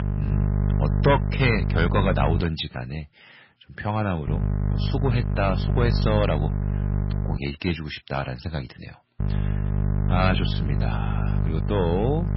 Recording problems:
garbled, watery; badly; nothing above 5.5 kHz
distortion; slight; 1.1% of the sound clipped
electrical hum; loud; until 2.5 s, from 4.5 to 7.5 s and from 9 s on; 50 Hz, 9 dB below the speech

